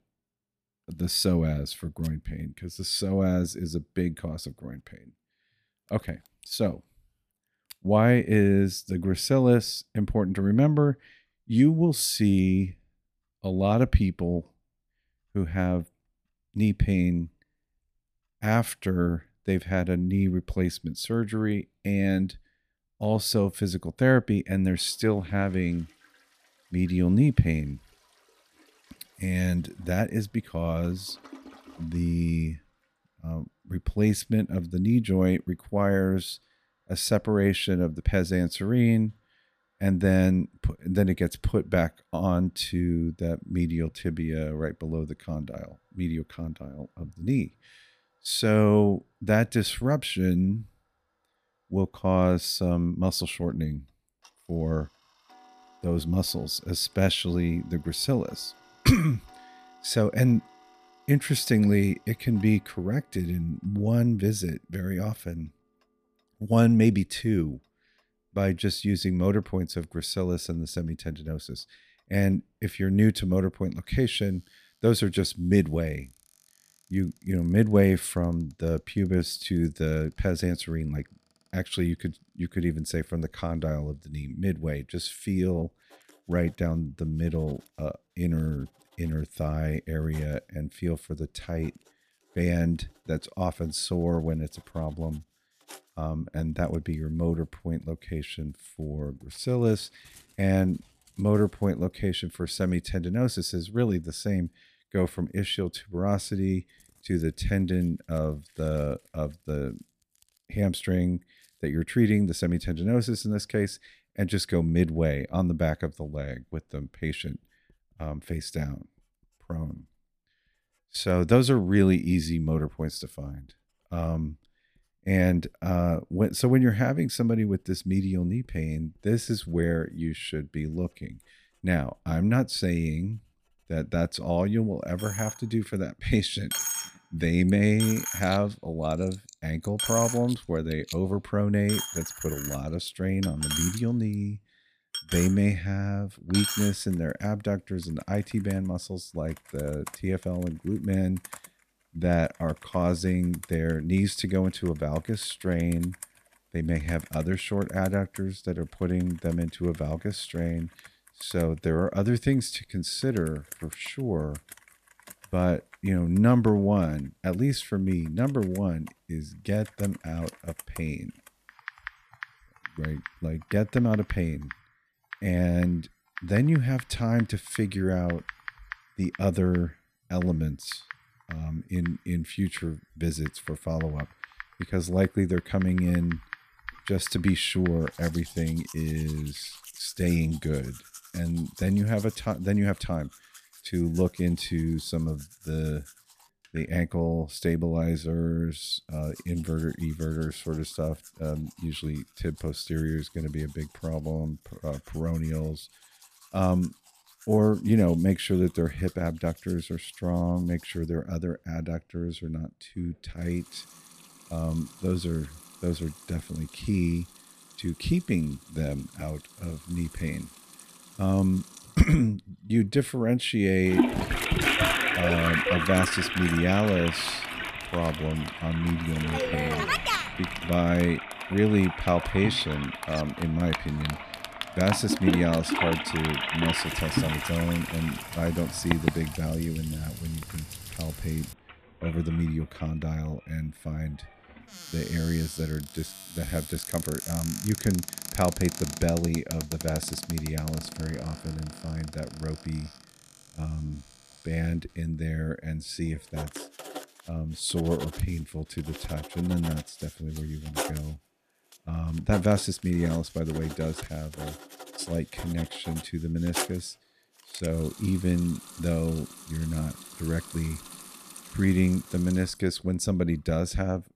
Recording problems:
household noises; loud; throughout; 8 dB below the speech

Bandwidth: 14.5 kHz